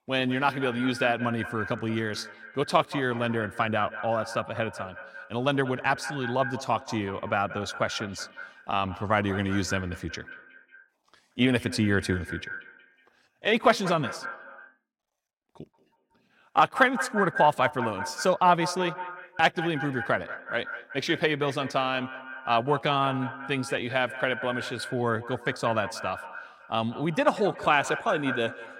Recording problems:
echo of what is said; strong; throughout; 180 ms later, 10 dB below the speech

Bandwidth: 16.5 kHz